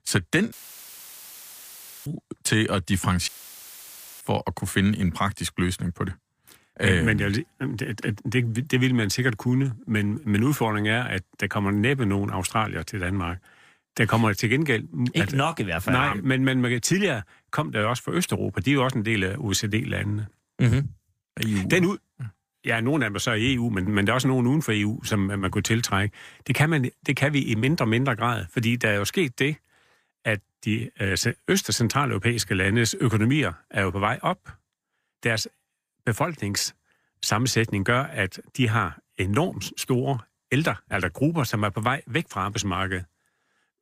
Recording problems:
audio cutting out; filled with static; at 0.5 s for 1.5 s and at 3.5 s for 1 s

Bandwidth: 15 kHz